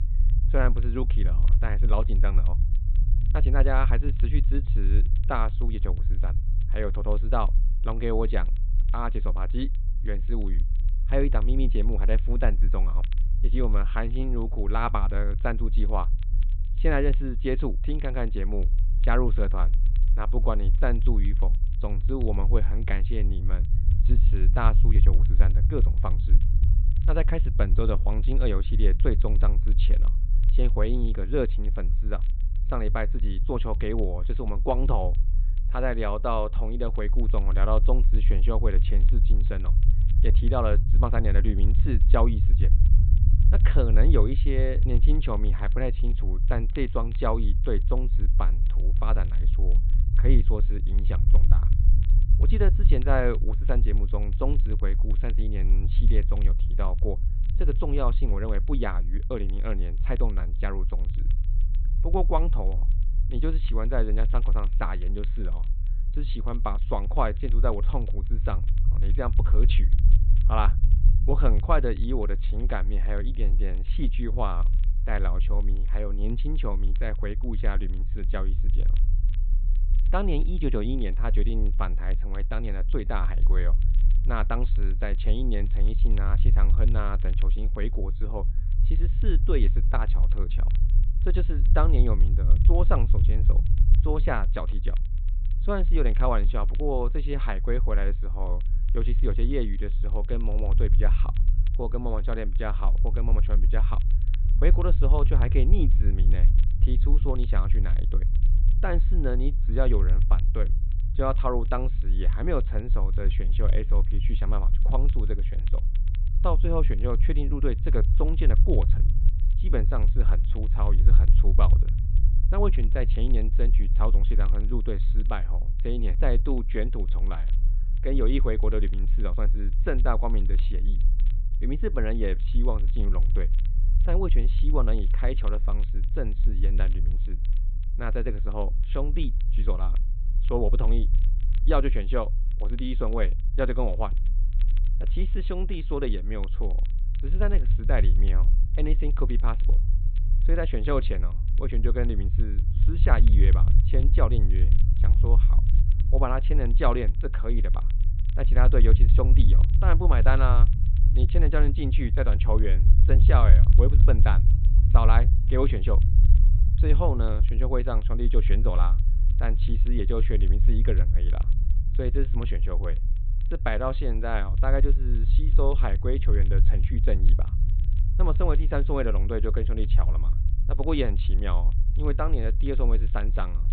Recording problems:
high frequencies cut off; severe; nothing above 4 kHz
low rumble; noticeable; throughout; 15 dB below the speech
crackle, like an old record; faint; 30 dB below the speech

